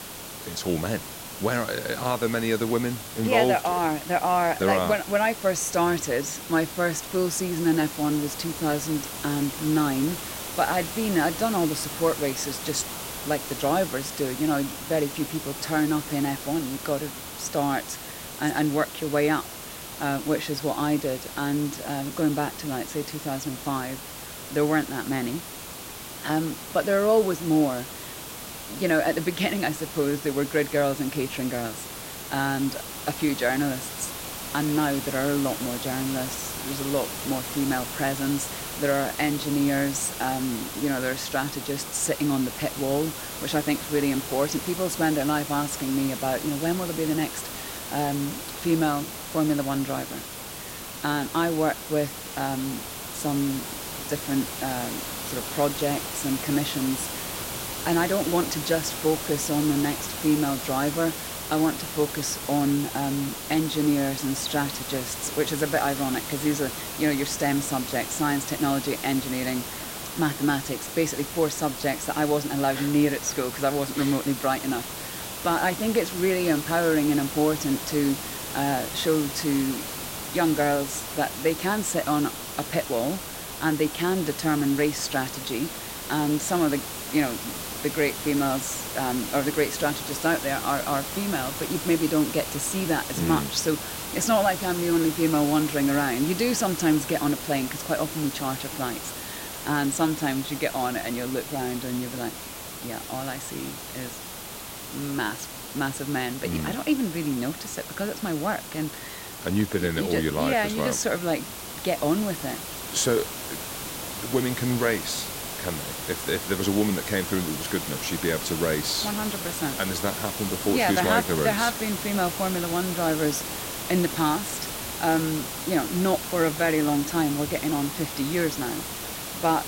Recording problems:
hiss; loud; throughout; 7 dB below the speech

